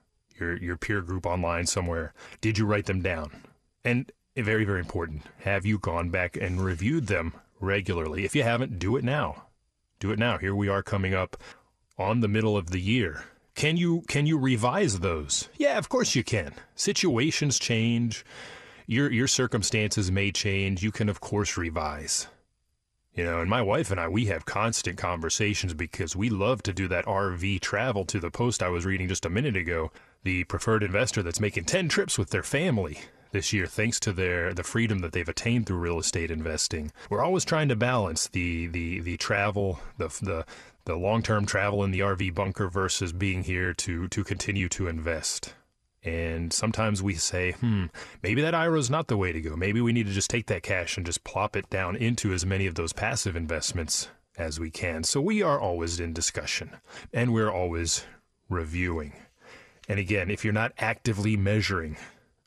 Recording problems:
none

